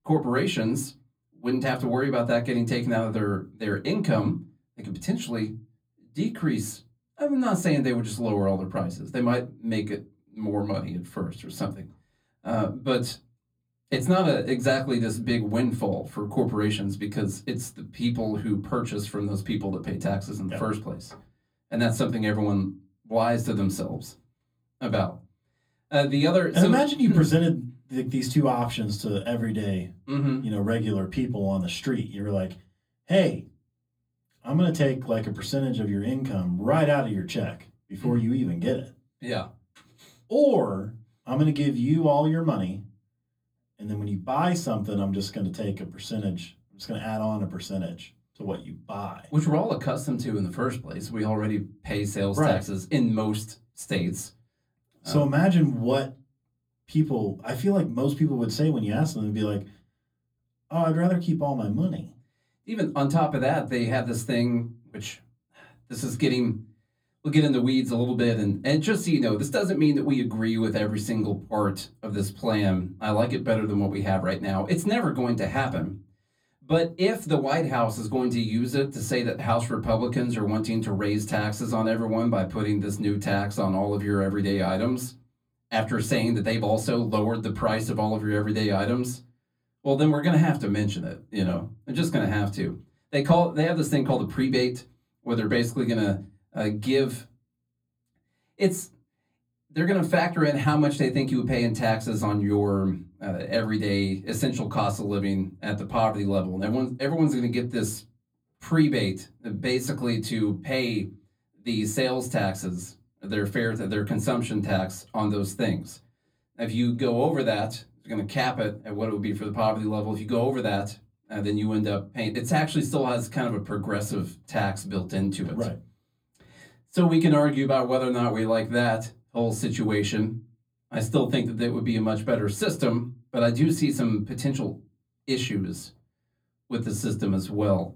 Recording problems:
off-mic speech; far
room echo; very slight; dies away in 0.2 s

